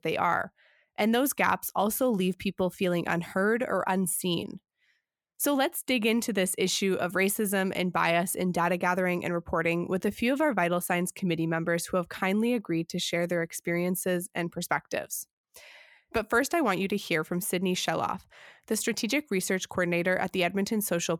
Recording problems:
none

